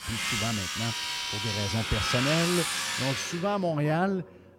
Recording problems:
household noises; very loud; throughout; 1 dB above the speech
chatter from many people; noticeable; throughout; 20 dB below the speech

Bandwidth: 16.5 kHz